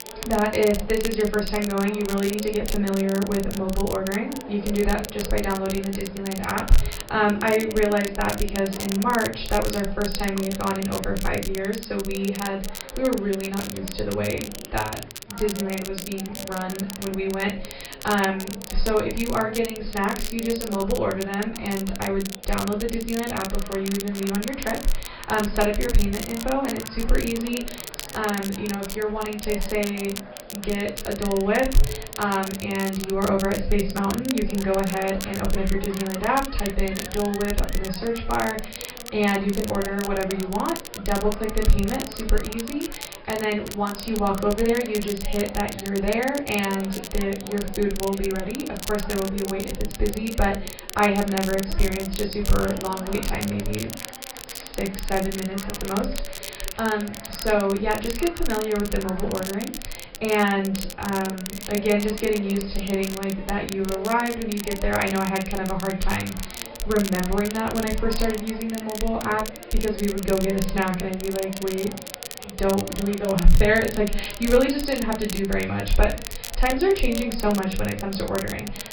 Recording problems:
off-mic speech; far
room echo; slight; dies away in 0.3 s
garbled, watery; slightly; nothing above 5 kHz
high frequencies cut off; slight
chatter from many people; noticeable; throughout; 15 dB below the speech
crackle, like an old record; noticeable; 10 dB below the speech

